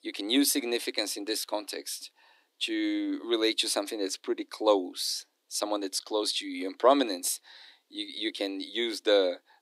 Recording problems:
thin; very slightly; fading below 250 Hz

